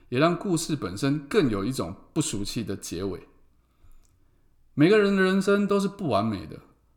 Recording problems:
echo of what is said; faint; throughout; 80 ms later, 20 dB below the speech

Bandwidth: 18.5 kHz